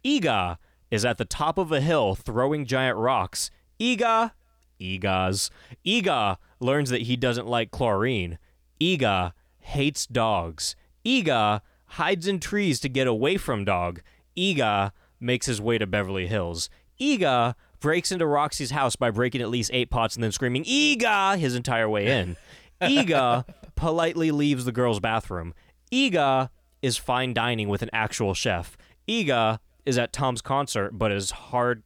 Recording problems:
none

